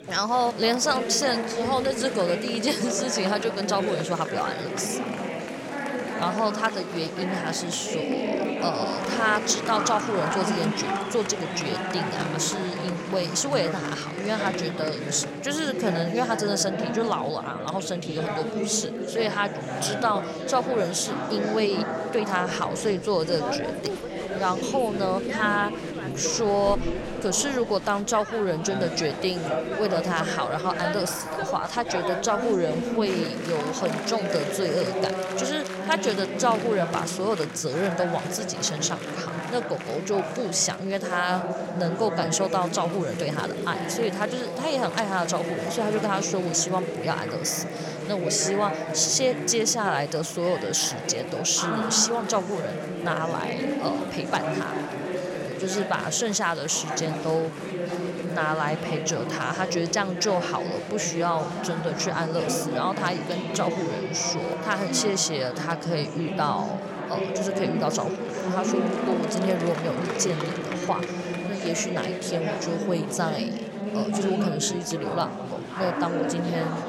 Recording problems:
chatter from many people; loud; throughout; 3 dB below the speech

